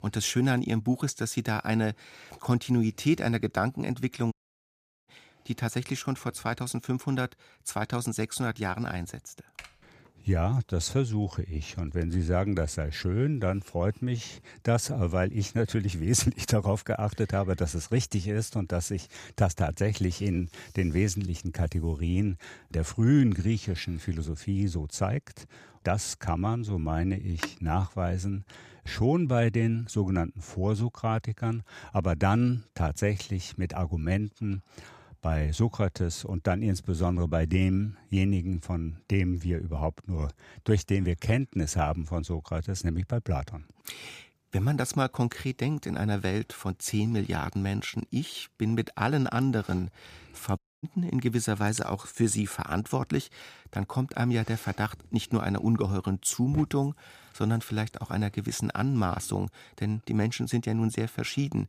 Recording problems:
audio cutting out; at 4.5 s for 1 s and at 51 s
keyboard typing; faint; at 9.5 s; peak 20 dB below the speech
phone ringing; noticeable; at 27 s; peak 8 dB below the speech

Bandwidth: 15 kHz